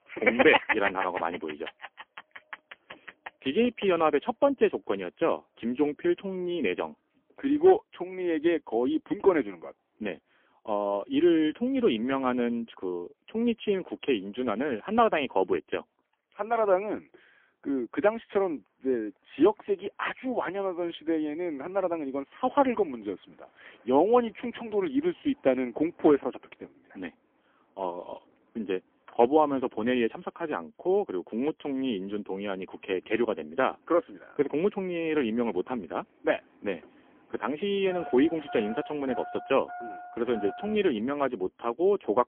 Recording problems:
phone-call audio; poor line; nothing above 3.5 kHz
traffic noise; noticeable; throughout; 15 dB below the speech

